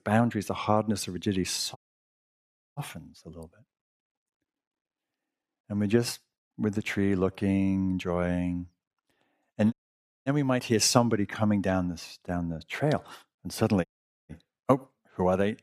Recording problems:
audio cutting out; at 2 s for 1 s, at 9.5 s for 0.5 s and at 14 s

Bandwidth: 15 kHz